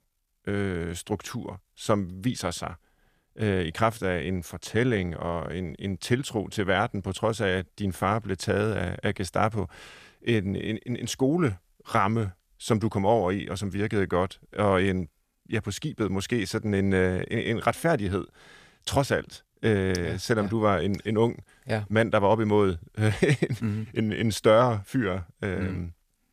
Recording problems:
none

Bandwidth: 14.5 kHz